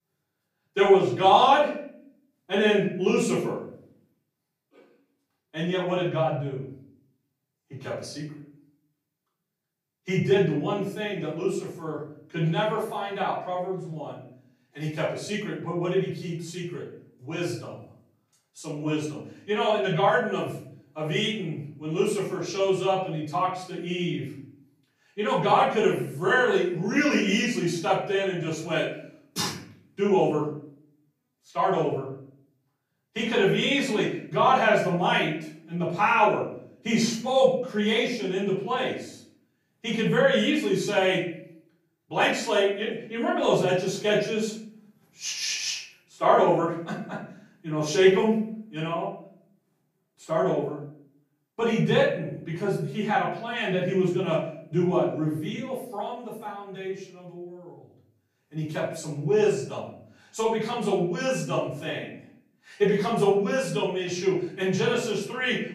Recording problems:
off-mic speech; far
room echo; noticeable; dies away in 0.6 s

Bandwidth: 15 kHz